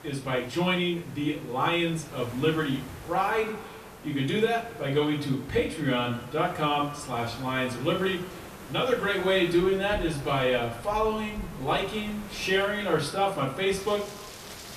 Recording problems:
off-mic speech; far
echo of what is said; noticeable; from 3 s on; 100 ms later, 15 dB below the speech
room echo; slight; dies away in 0.4 s
rain or running water; noticeable; from 9.5 s on; 20 dB below the speech
hiss; noticeable; throughout; 15 dB below the speech

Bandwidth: 14.5 kHz